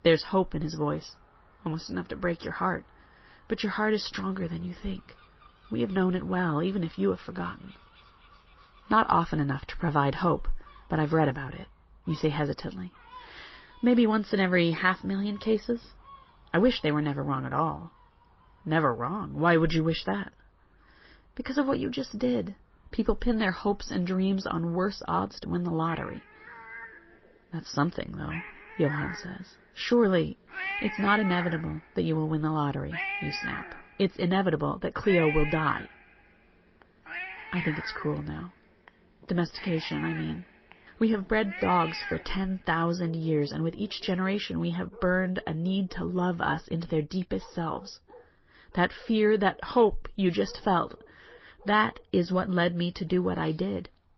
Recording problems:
garbled, watery; slightly; nothing above 5.5 kHz
animal sounds; loud; throughout; 10 dB below the speech

